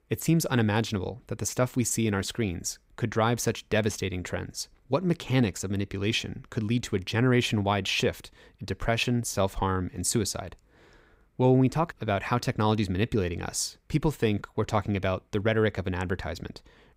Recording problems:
none

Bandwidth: 15.5 kHz